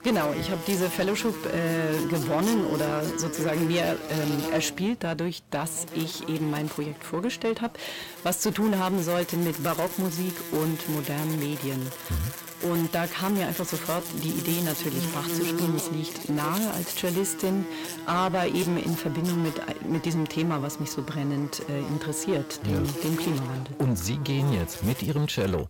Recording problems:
distortion; slight; 10 dB below the speech
electrical hum; loud; throughout; 50 Hz, 6 dB below the speech

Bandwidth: 16.5 kHz